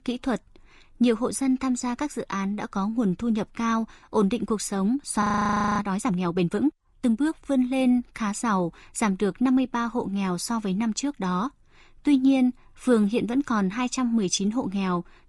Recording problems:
garbled, watery; slightly; nothing above 10.5 kHz
audio freezing; at 5 s for 0.5 s

